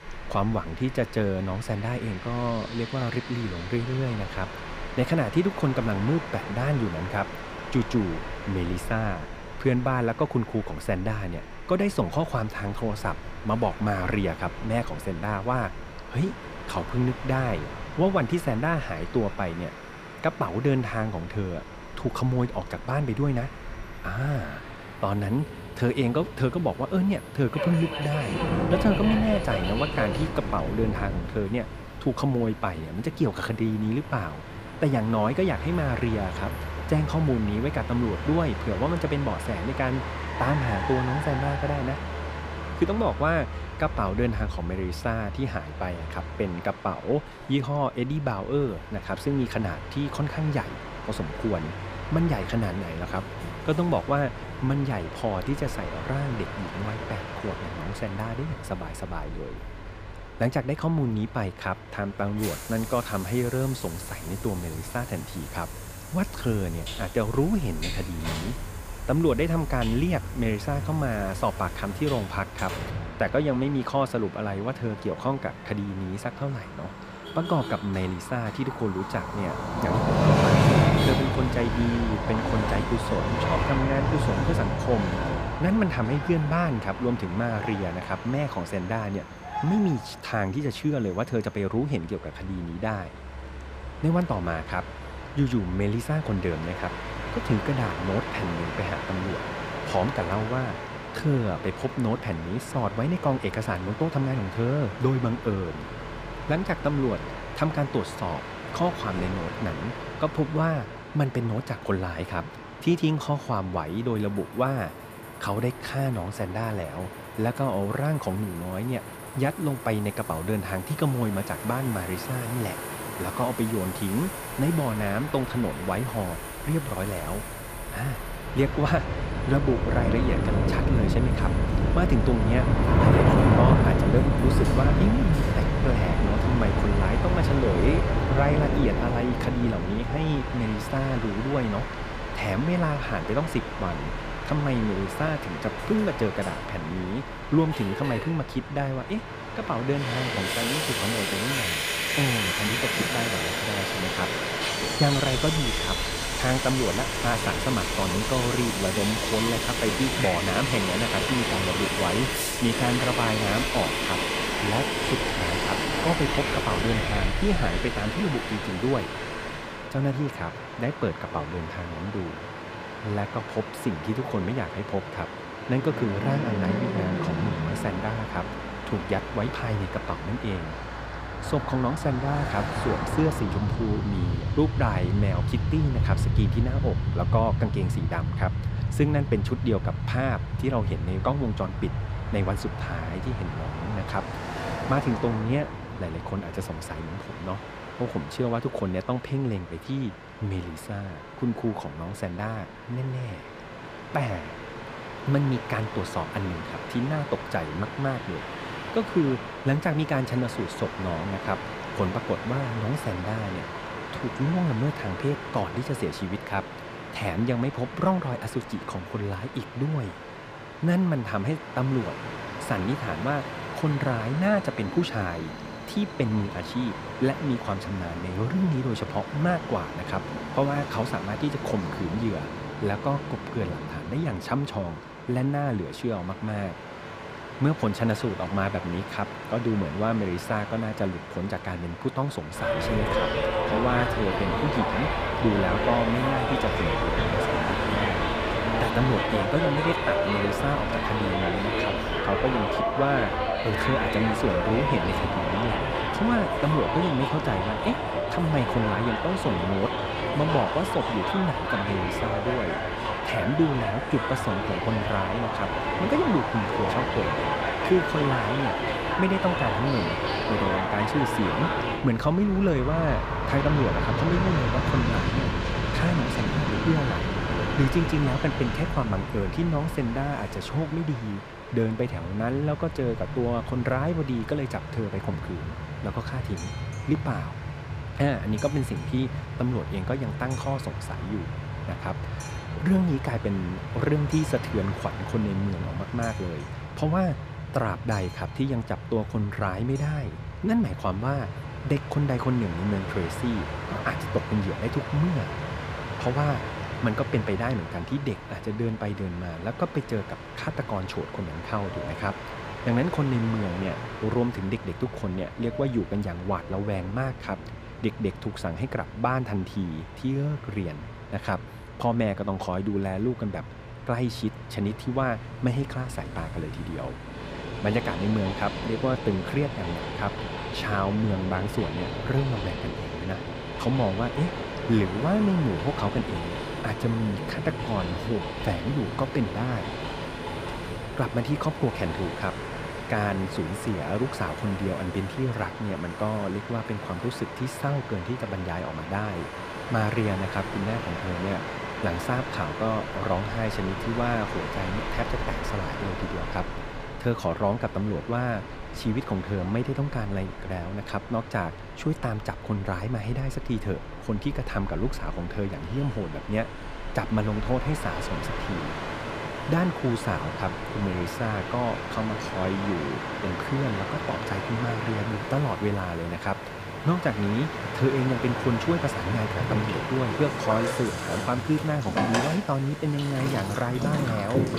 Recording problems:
train or aircraft noise; loud; throughout; 2 dB below the speech
traffic noise; noticeable; throughout; 15 dB below the speech

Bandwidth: 15 kHz